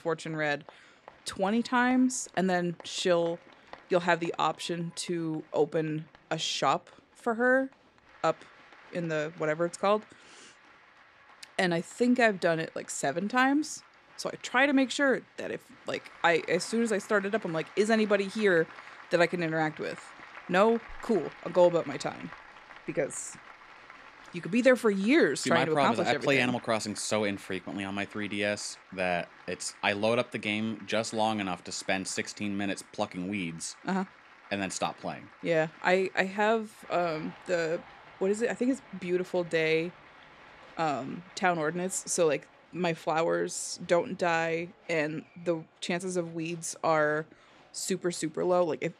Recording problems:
crowd noise; faint; throughout; 20 dB below the speech

